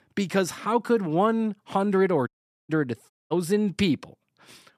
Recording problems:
audio cutting out; at 2.5 s and at 3 s

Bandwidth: 14.5 kHz